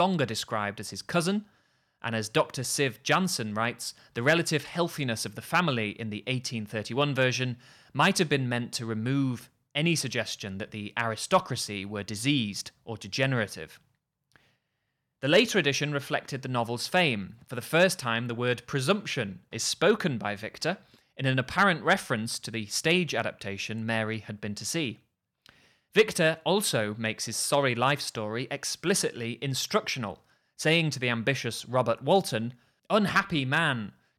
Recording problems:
abrupt cut into speech; at the start

